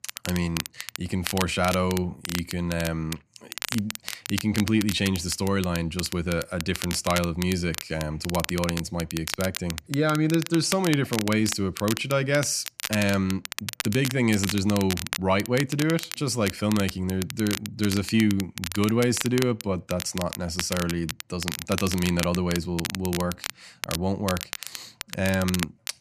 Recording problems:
crackle, like an old record; loud; 8 dB below the speech

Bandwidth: 14.5 kHz